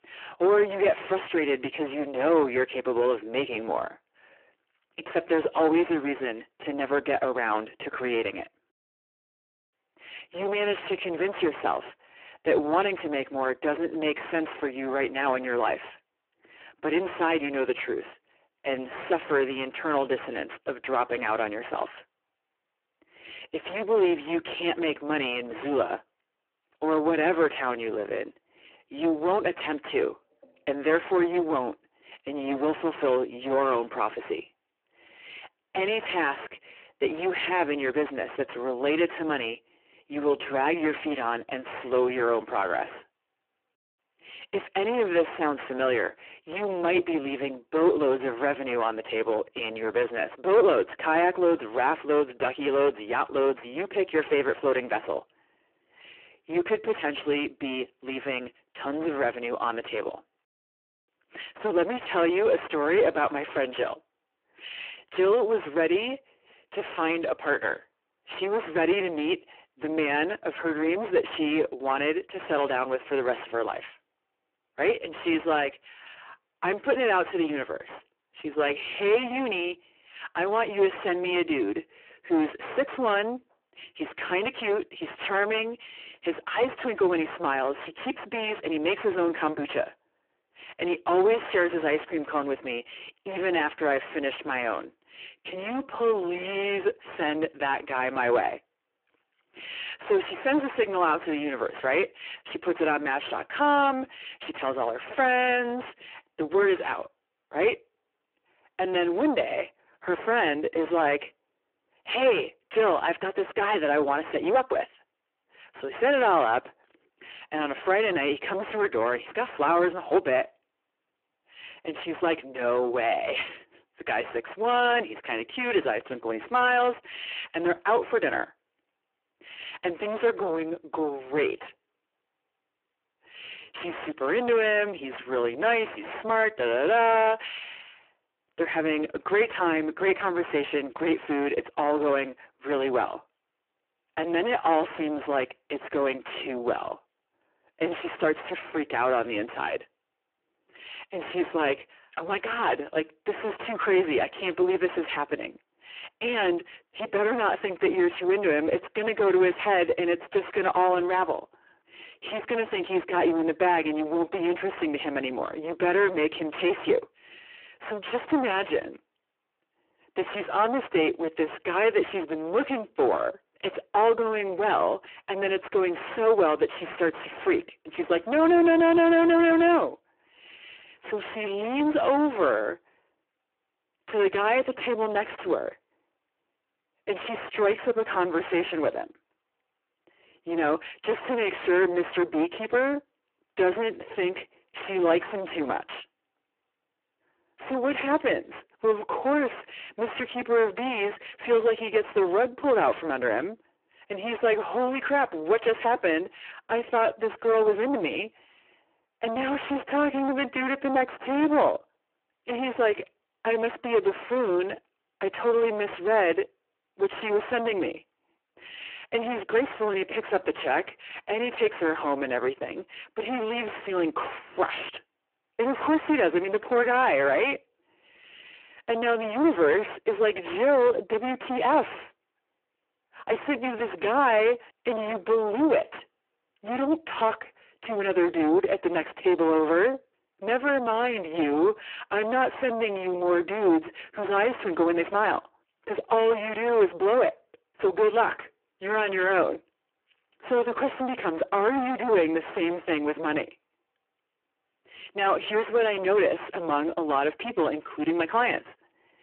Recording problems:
phone-call audio; poor line
distortion; heavy; 7 dB below the speech

